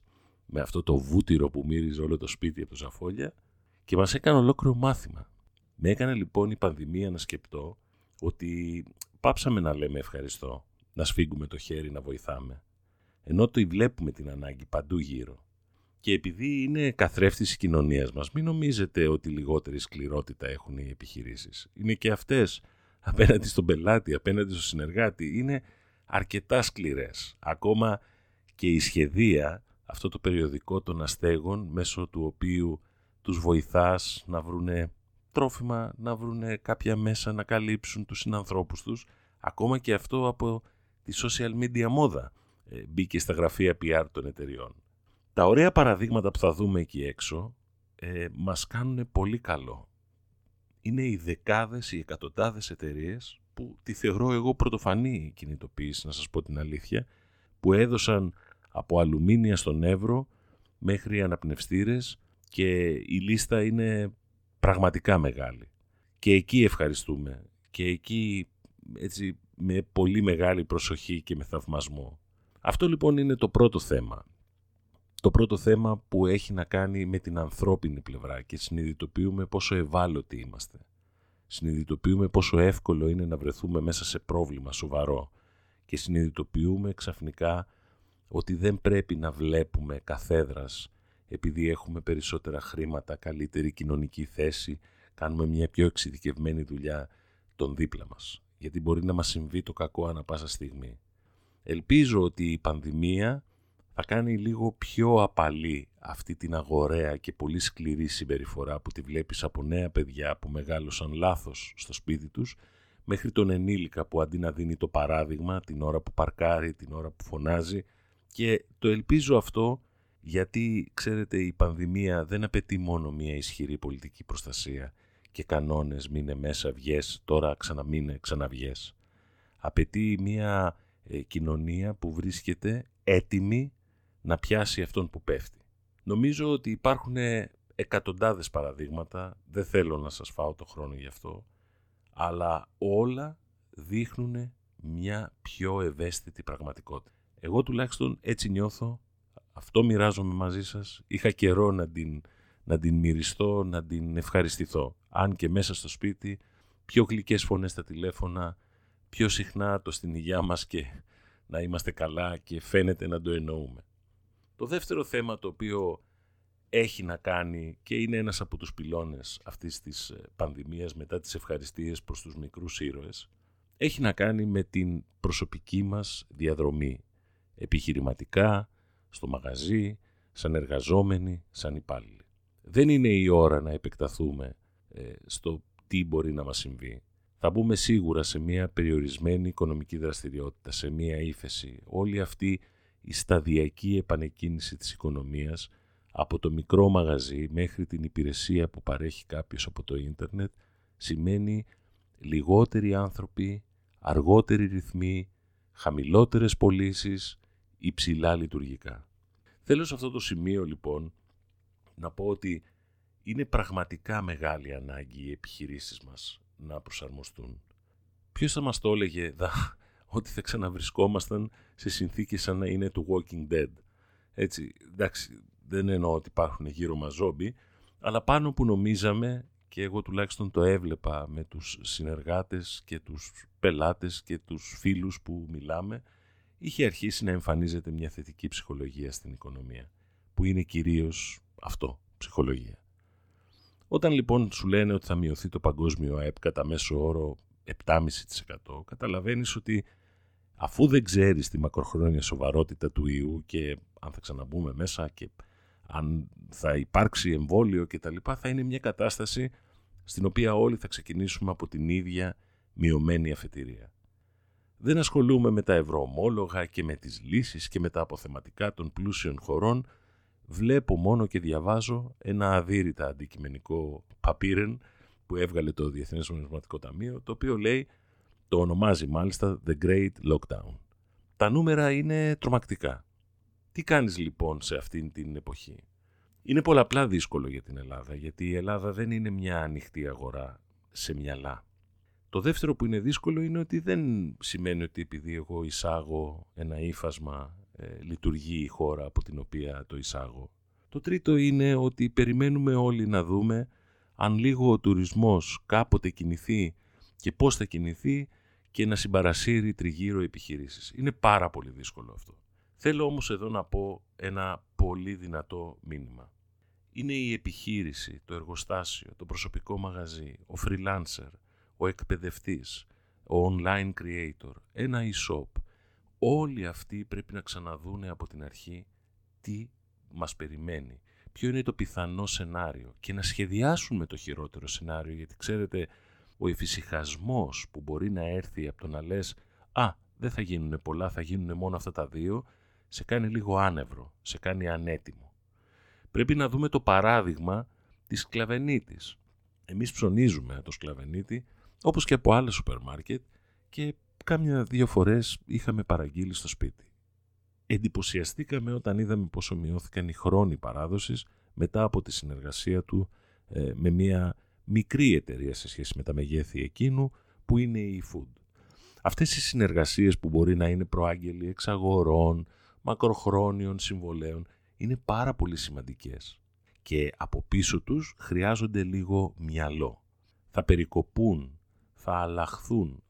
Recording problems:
none

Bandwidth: 18 kHz